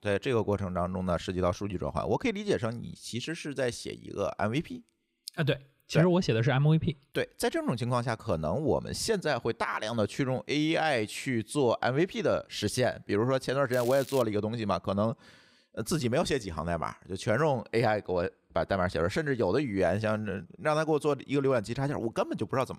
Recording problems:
crackling; noticeable; at 14 s; 15 dB below the speech

